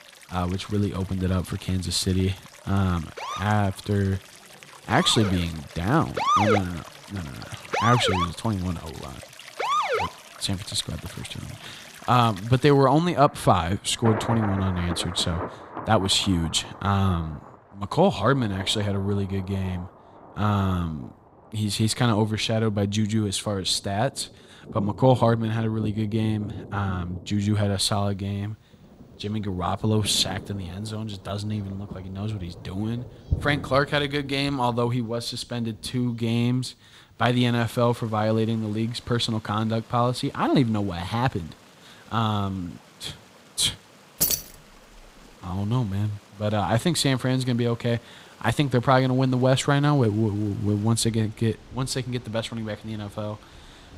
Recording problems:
rain or running water; noticeable; throughout; 15 dB below the speech
siren; loud; from 3 to 10 s; peak 4 dB above the speech
jangling keys; loud; at 44 s; peak 2 dB above the speech

